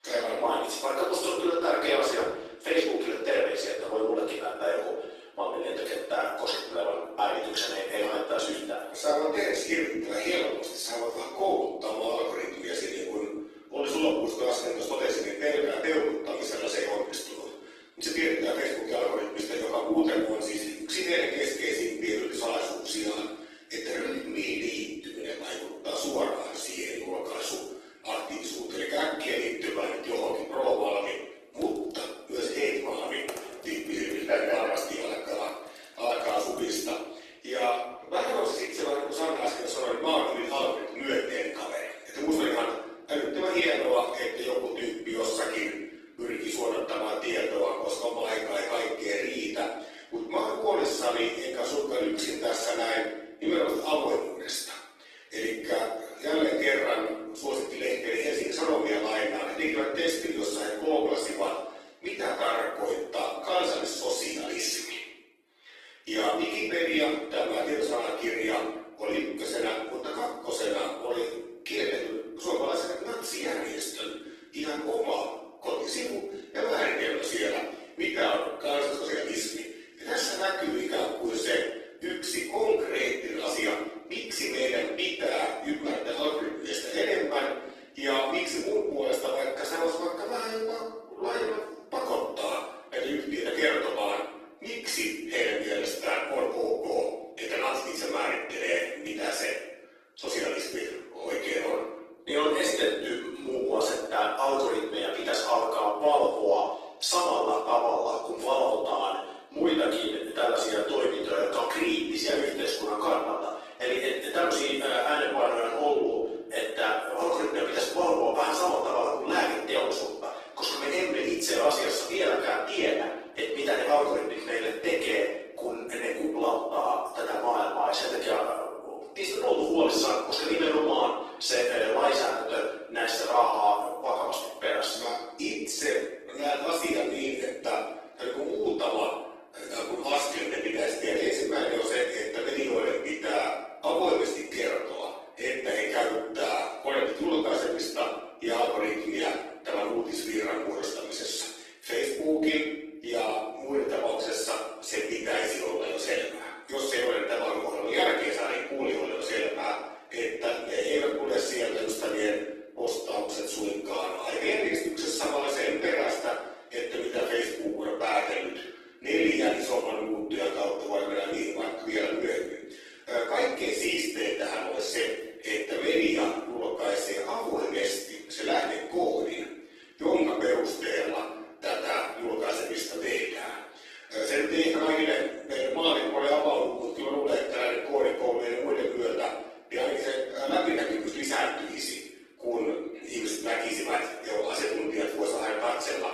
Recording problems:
room echo; strong; dies away in 0.8 s
off-mic speech; far
thin; somewhat; fading below 300 Hz
garbled, watery; slightly; nothing above 14 kHz
keyboard typing; faint; from 32 to 37 s; peak 10 dB below the speech

